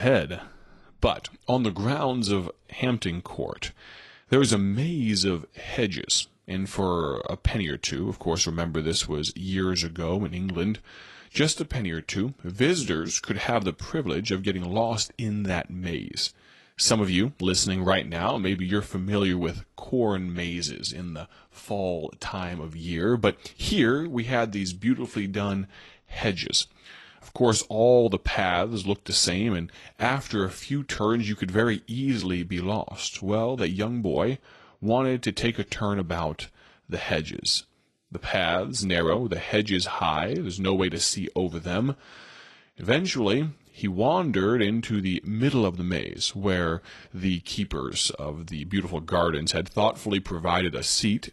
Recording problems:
garbled, watery; slightly
abrupt cut into speech; at the start

